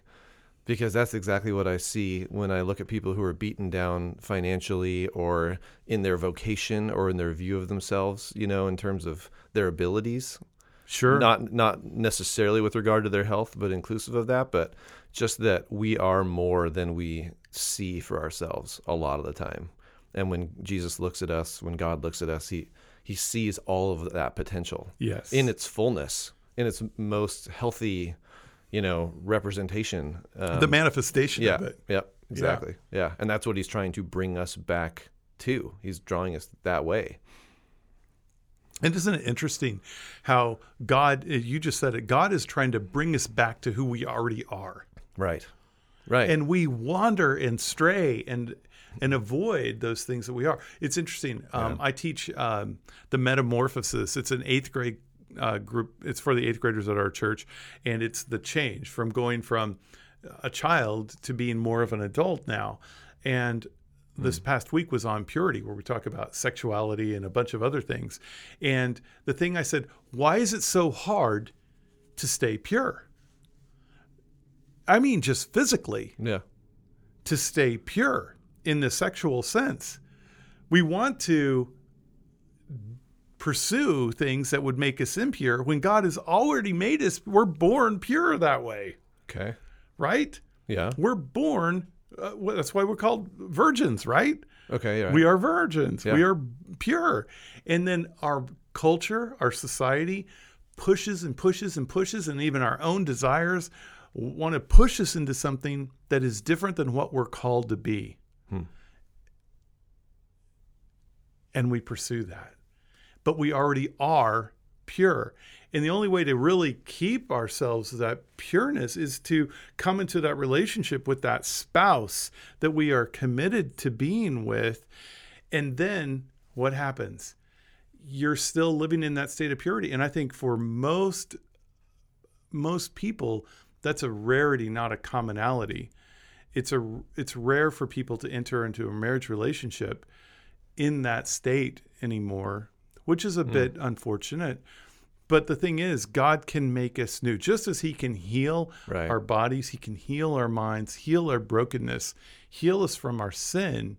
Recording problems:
none

